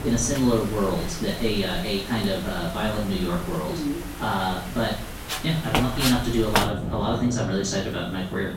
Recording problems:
off-mic speech; far
room echo; noticeable; dies away in 0.5 s
echo of what is said; faint; throughout; 210 ms later, 25 dB below the speech
wind in the background; loud; throughout; 6 dB below the speech

